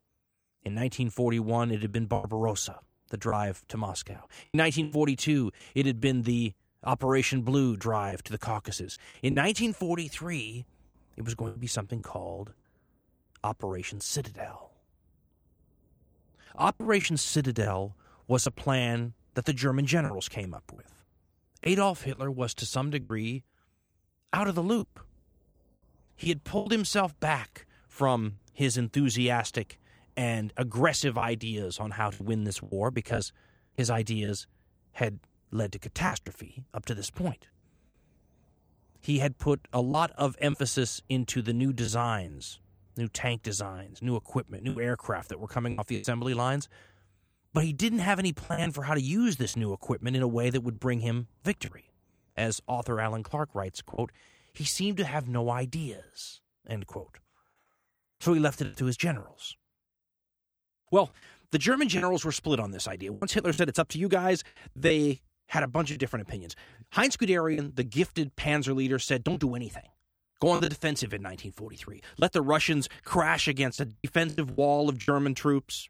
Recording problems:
choppy; occasionally; 5% of the speech affected

